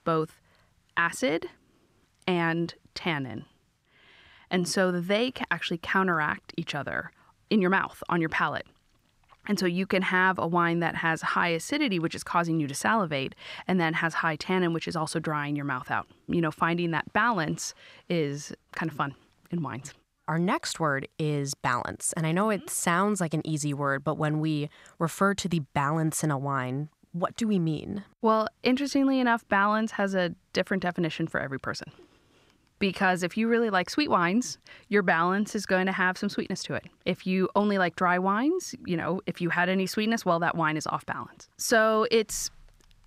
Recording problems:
none

